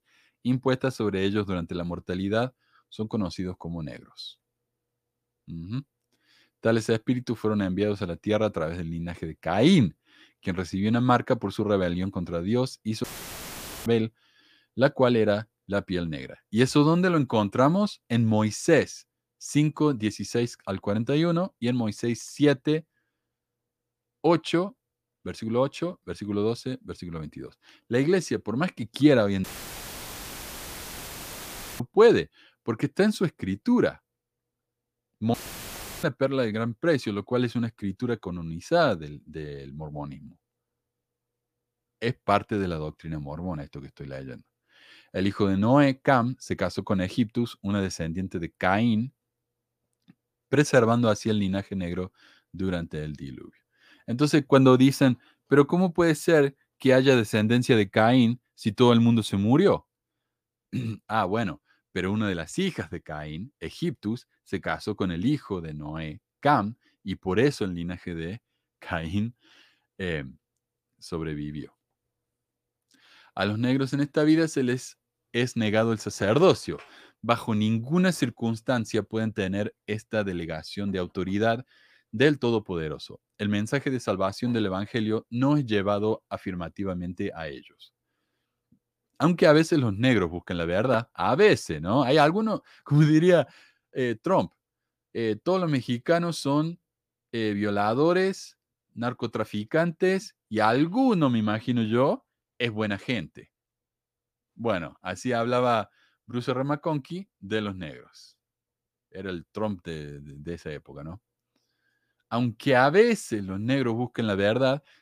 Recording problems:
audio cutting out; filled with static; at 13 s for 1 s, at 29 s for 2.5 s and at 35 s for 0.5 s

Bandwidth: 15 kHz